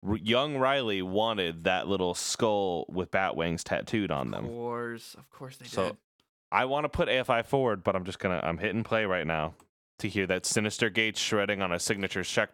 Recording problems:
none

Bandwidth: 17 kHz